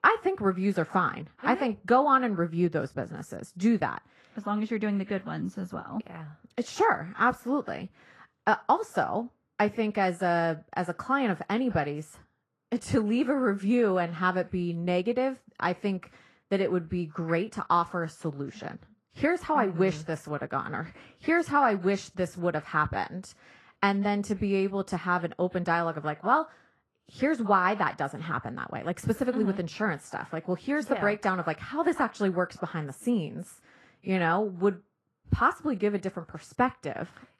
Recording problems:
muffled; slightly; fading above 3 kHz
garbled, watery; slightly

